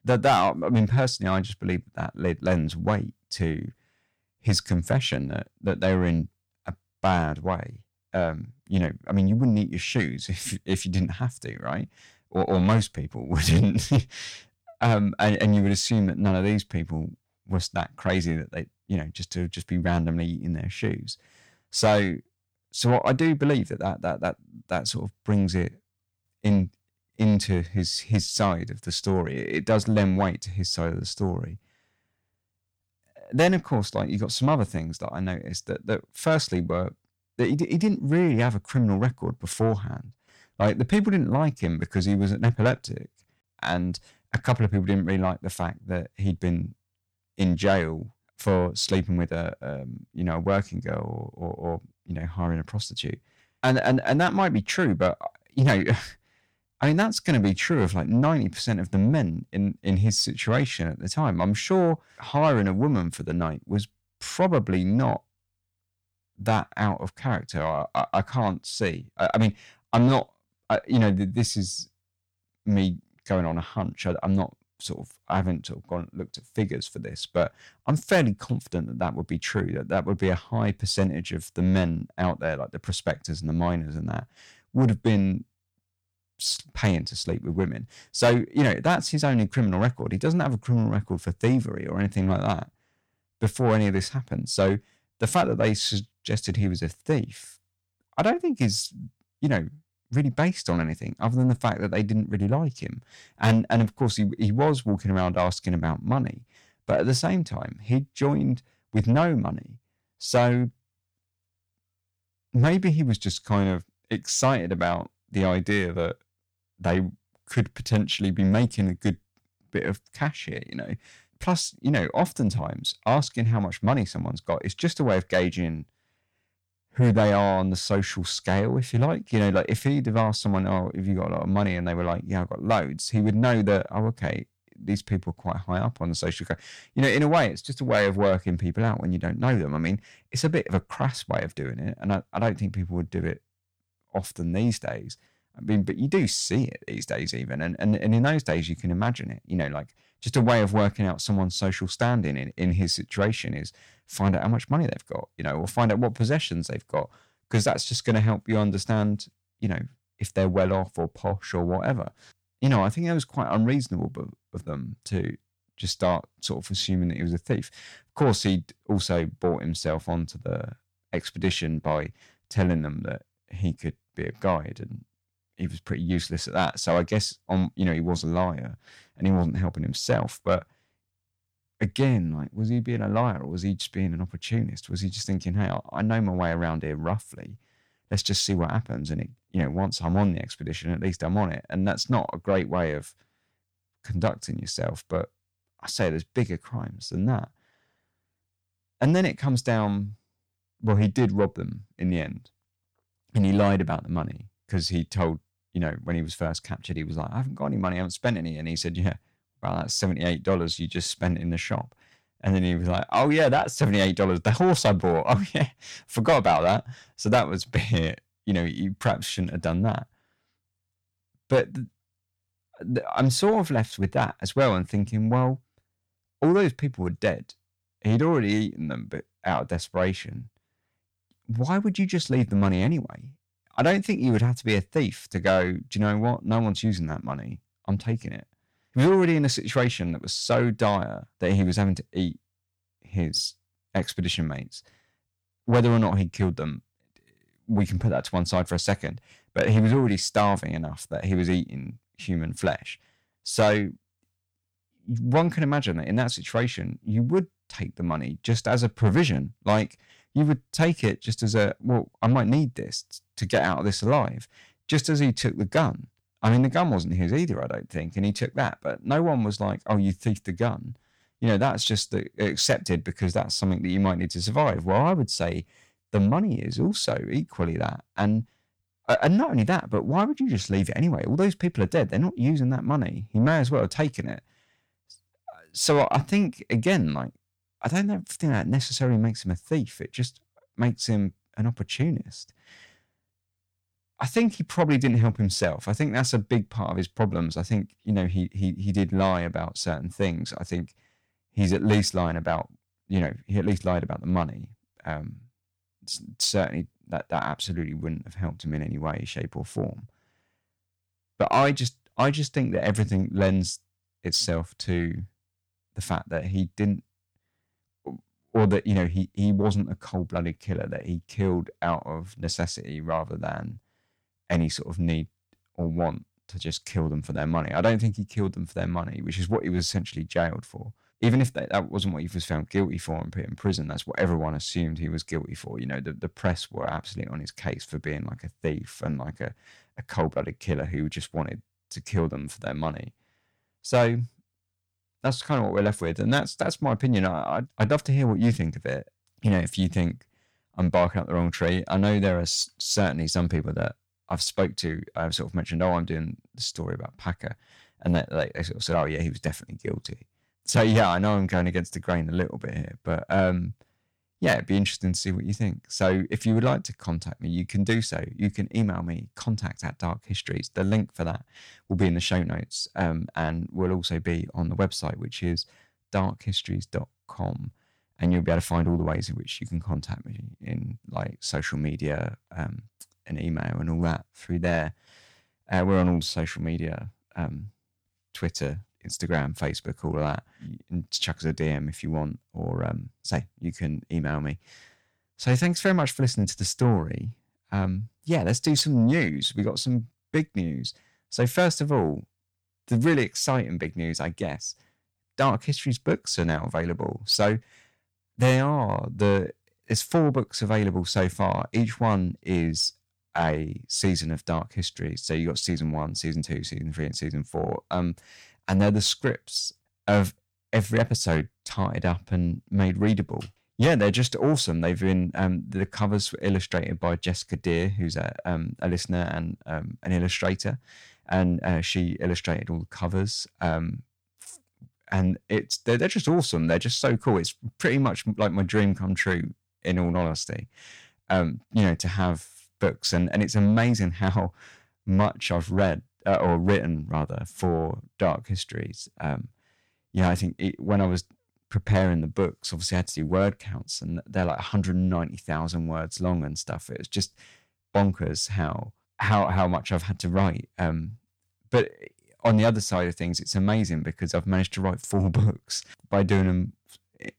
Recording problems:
distortion; slight; 10 dB below the speech

